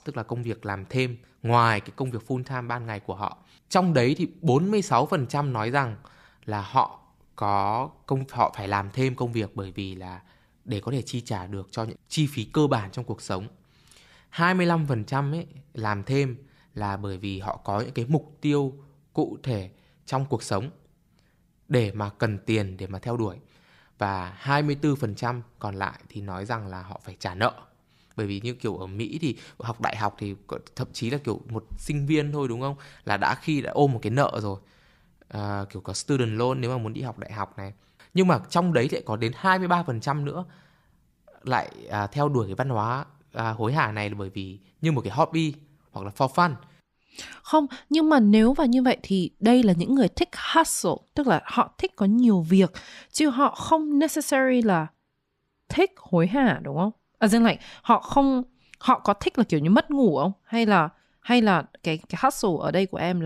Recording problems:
abrupt cut into speech; at the end

